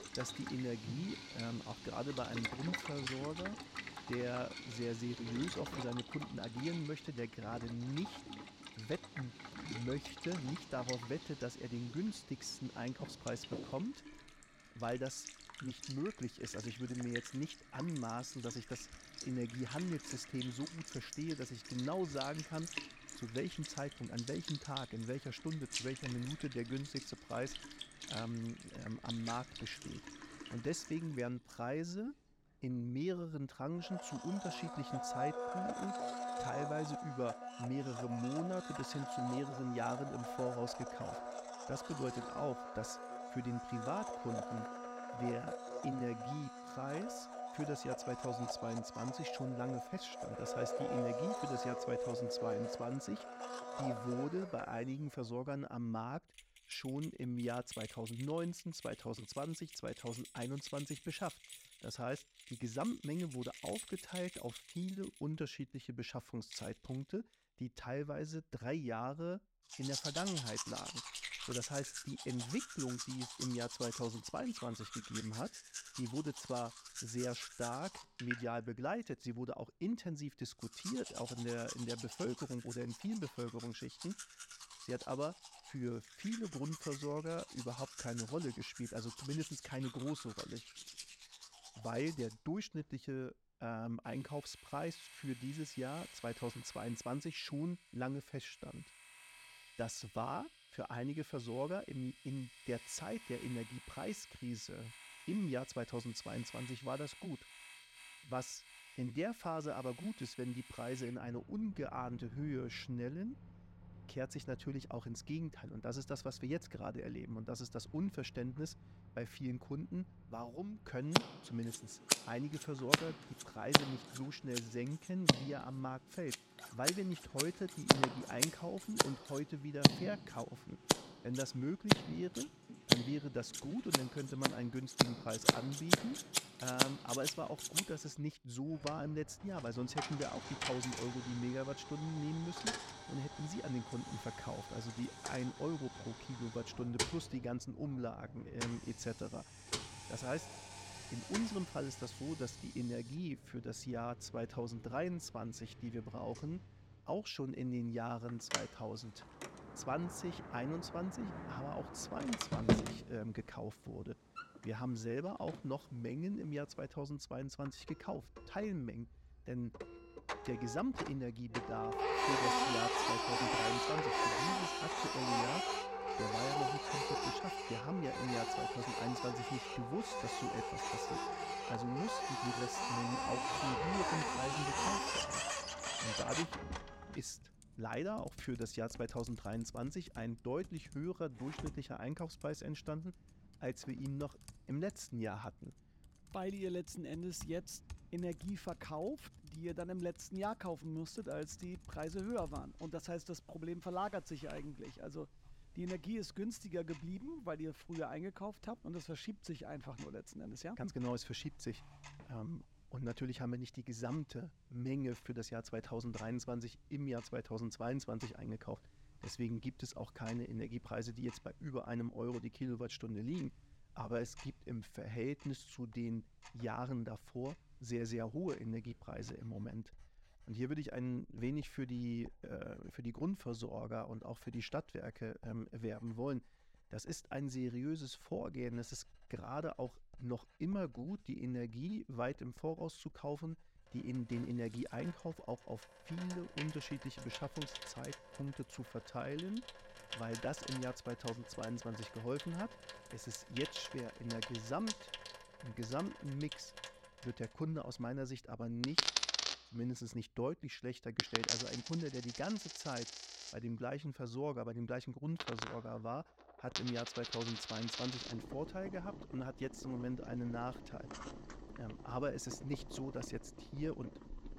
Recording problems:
household noises; very loud; throughout; 1 dB above the speech

